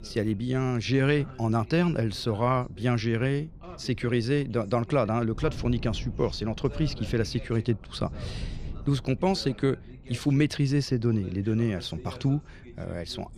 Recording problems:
wind noise on the microphone; occasional gusts; 25 dB below the speech
voice in the background; faint; throughout; 20 dB below the speech

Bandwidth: 14 kHz